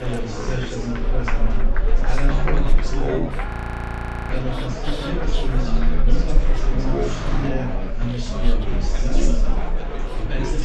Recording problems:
wrong speed and pitch; too slow and too low; 0.6 times normal speed
chatter from many people; very loud; throughout; 4 dB above the speech
traffic noise; loud; throughout; 5 dB below the speech
low rumble; noticeable; throughout; 10 dB below the speech
audio freezing; at 3.5 s for 1 s

